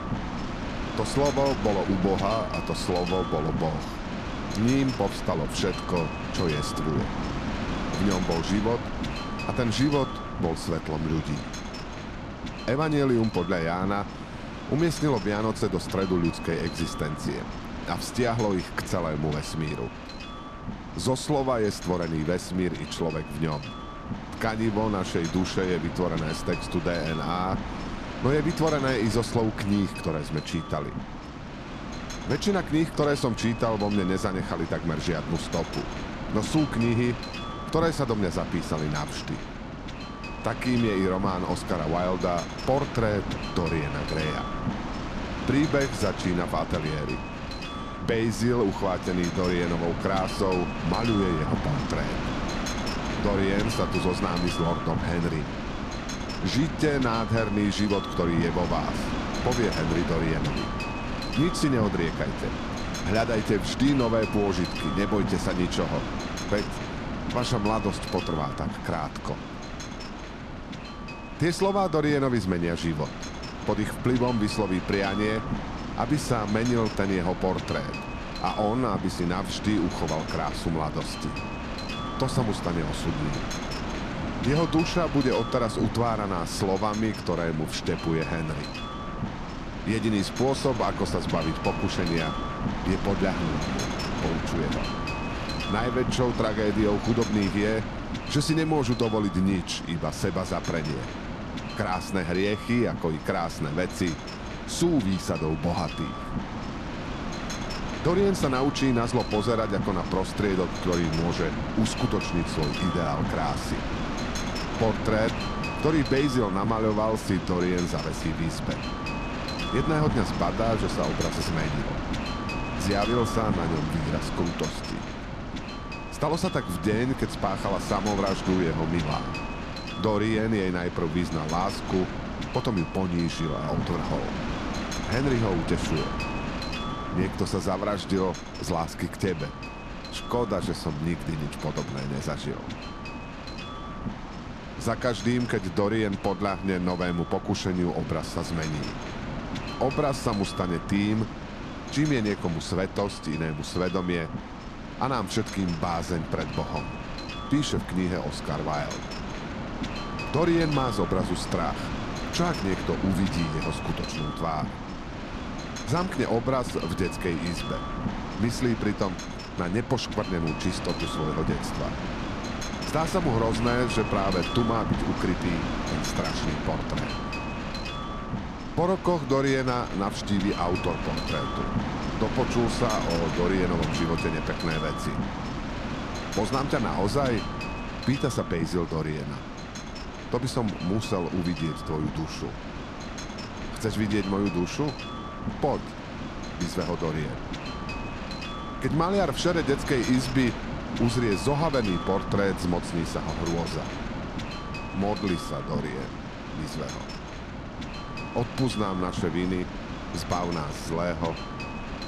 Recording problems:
wind noise on the microphone; heavy; 5 dB below the speech

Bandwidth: 14 kHz